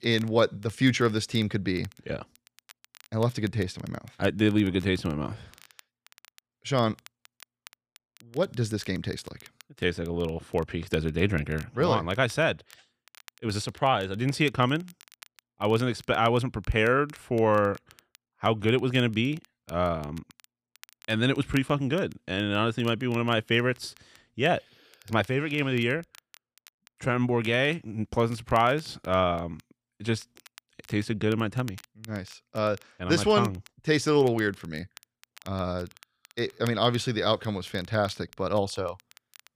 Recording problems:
crackle, like an old record; faint; 25 dB below the speech

